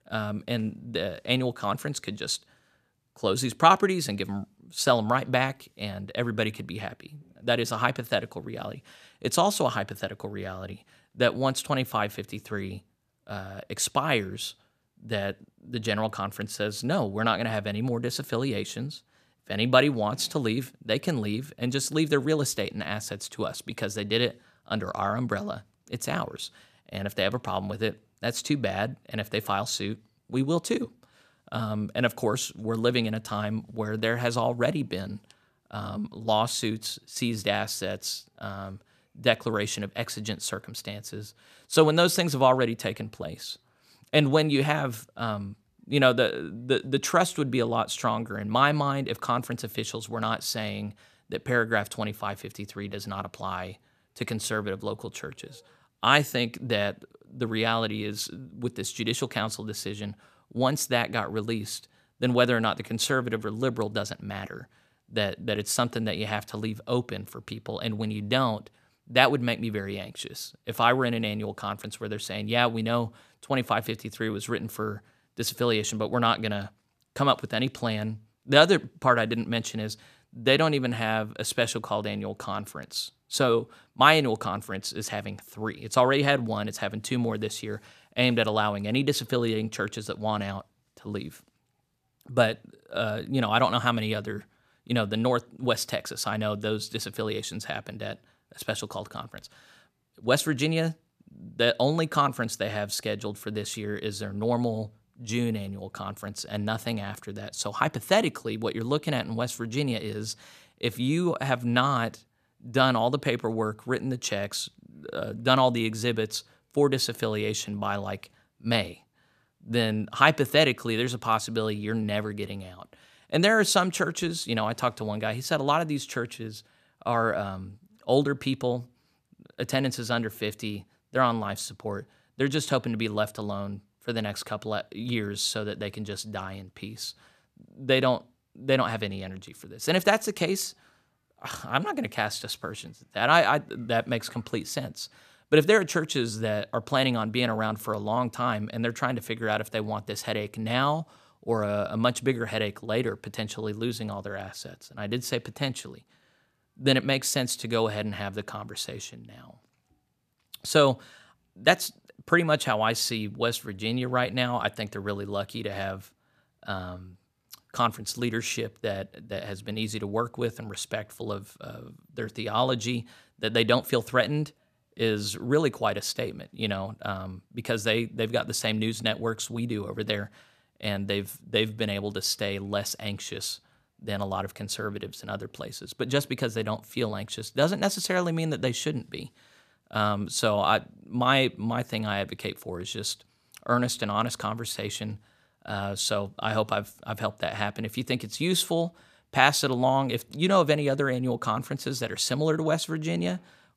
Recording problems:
none

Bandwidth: 14.5 kHz